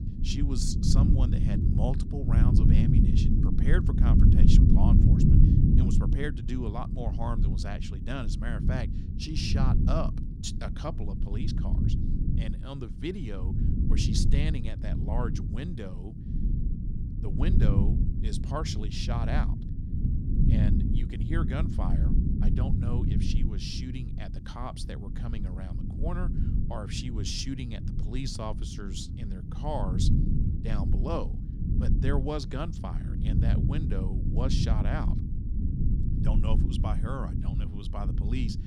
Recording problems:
low rumble; loud; throughout; 1 dB below the speech

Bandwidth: 16 kHz